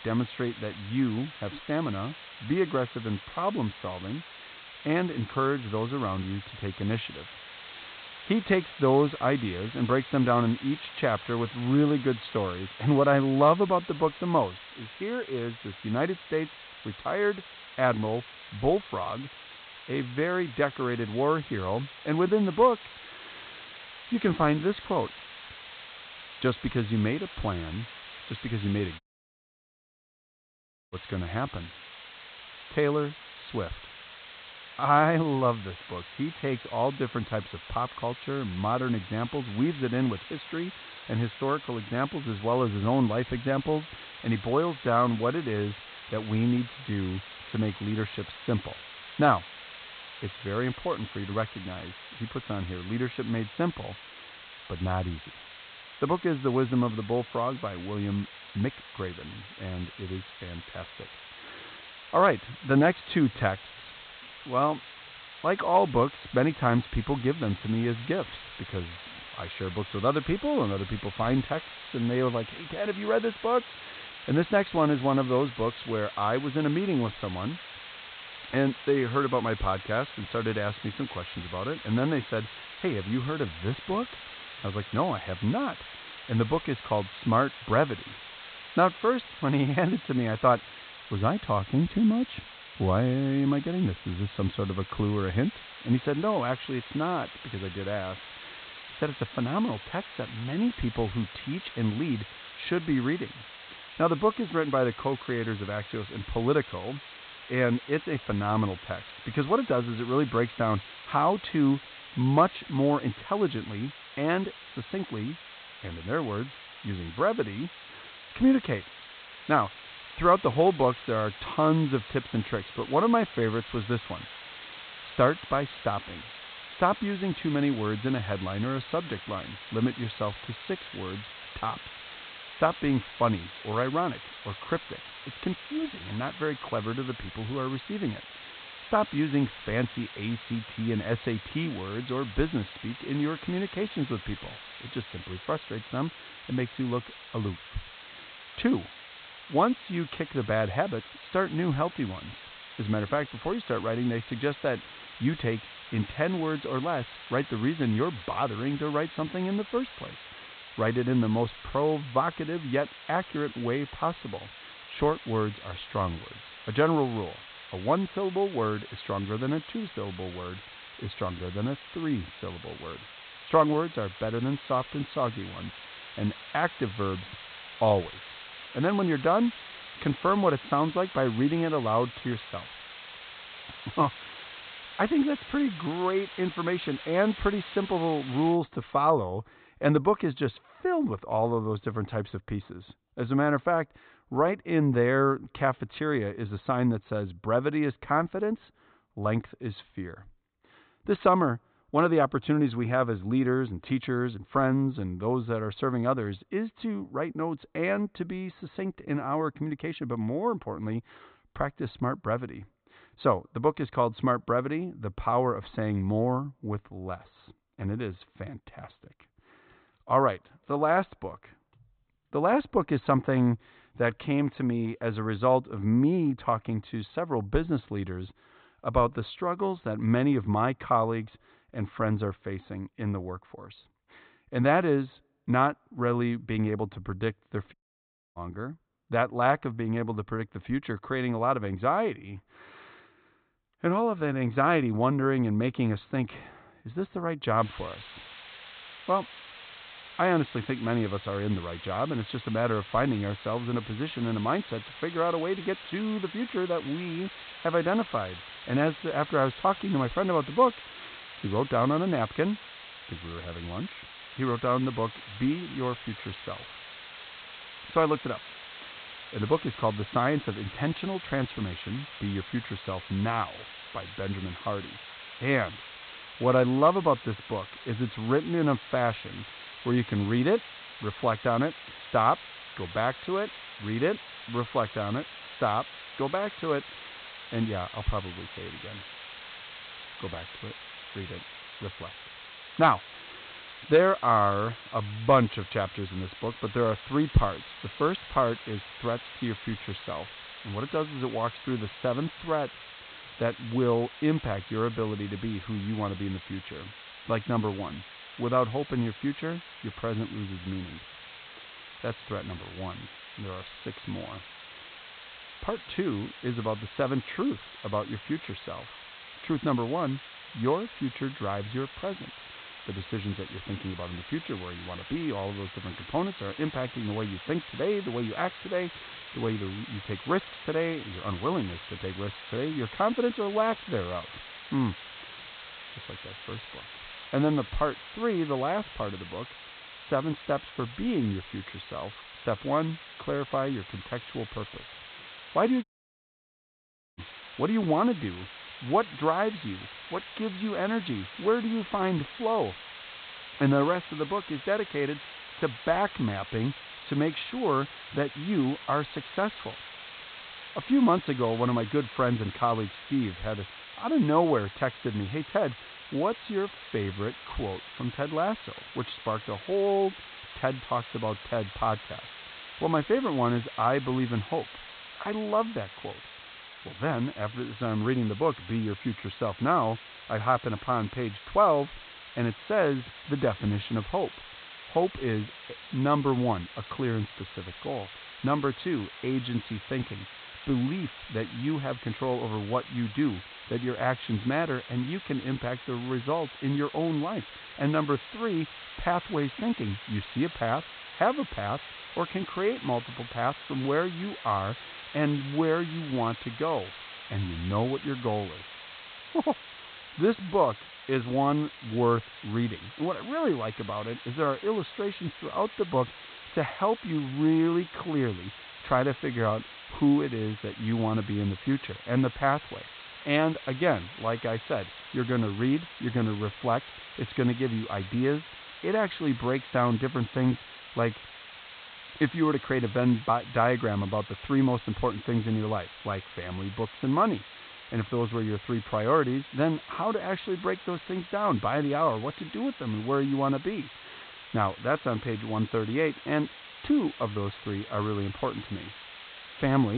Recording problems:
high frequencies cut off; severe; nothing above 4 kHz
hiss; noticeable; until 3:09 and from 4:08 on; 15 dB below the speech
audio cutting out; at 29 s for 2 s, at 3:58 for 0.5 s and at 5:46 for 1.5 s
abrupt cut into speech; at the end

